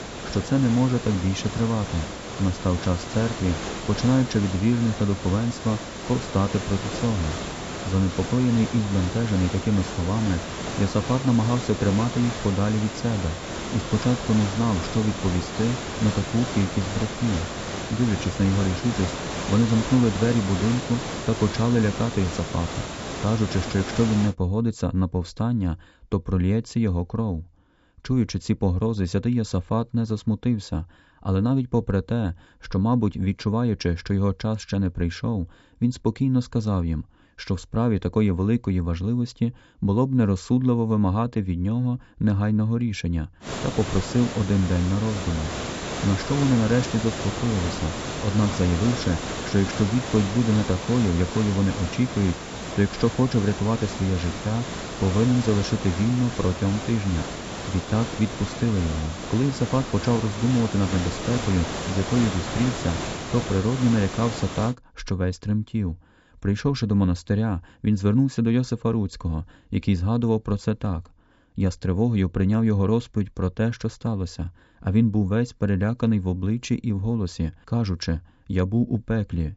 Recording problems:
high frequencies cut off; noticeable; nothing above 8 kHz
hiss; loud; until 24 s and from 43 s to 1:05; 7 dB below the speech

